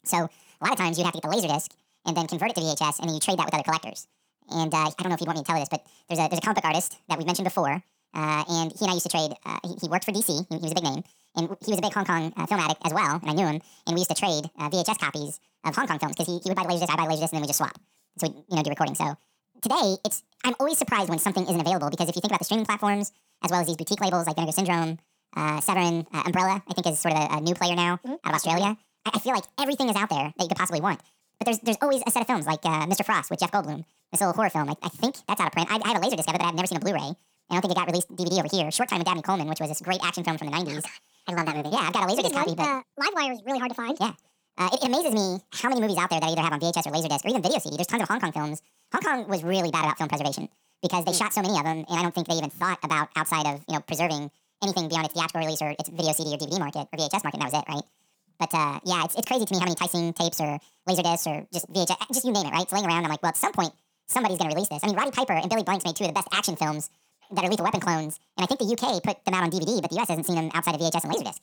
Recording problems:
wrong speed and pitch; too fast and too high; 1.7 times normal speed

